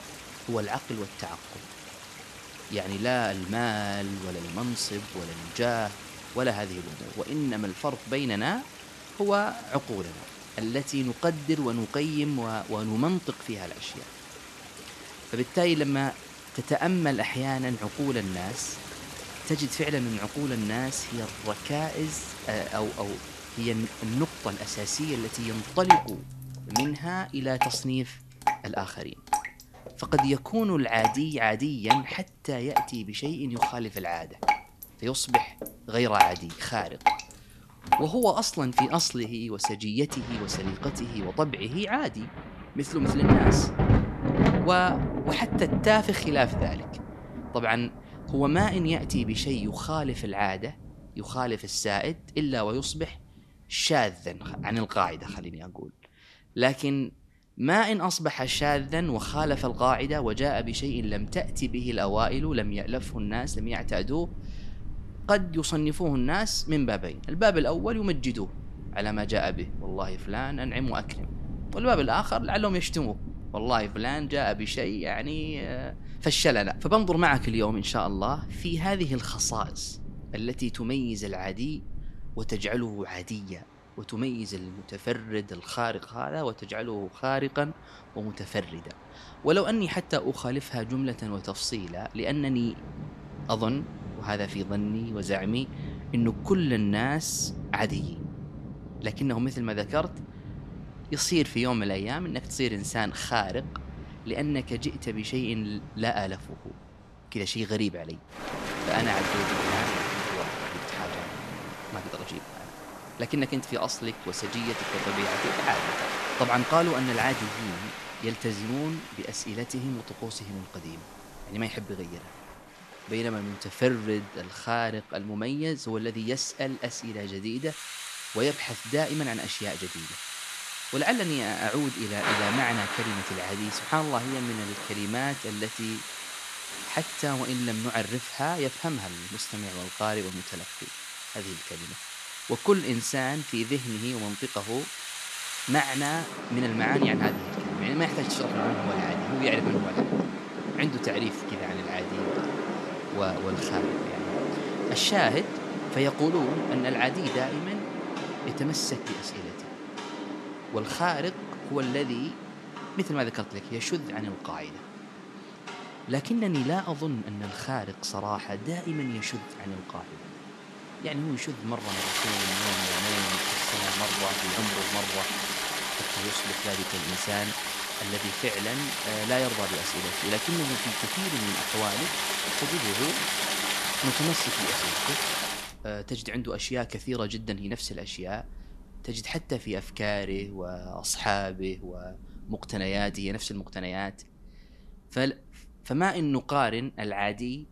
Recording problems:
rain or running water; loud; throughout; 3 dB below the speech

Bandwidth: 13.5 kHz